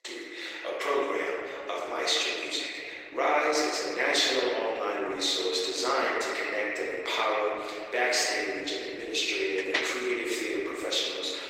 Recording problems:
off-mic speech; far
thin; very; fading below 300 Hz
room echo; noticeable; dies away in 2.6 s
garbled, watery; slightly; nothing above 16 kHz
door banging; noticeable; at 9.5 s; peak 1 dB below the speech

